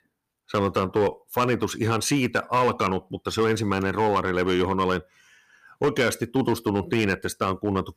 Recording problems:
distortion; slight; 6% of the sound clipped

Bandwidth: 15 kHz